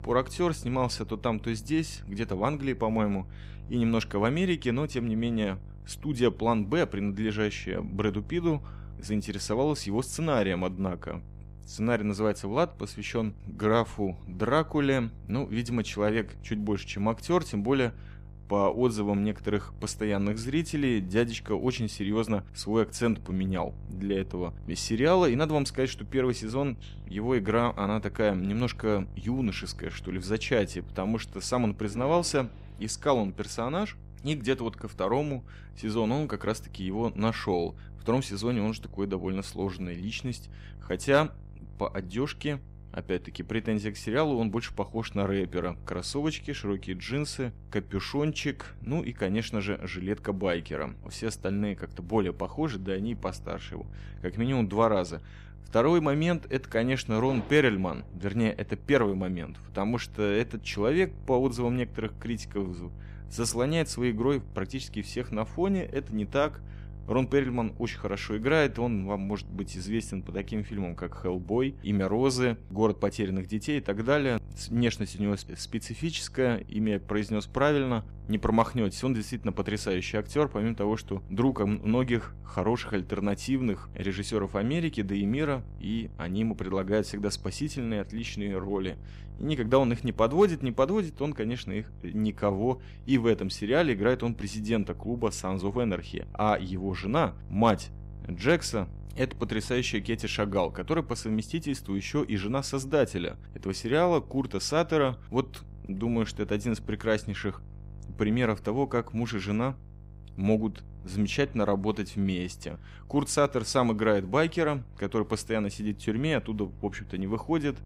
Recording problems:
electrical hum; faint; throughout; 50 Hz, 25 dB below the speech

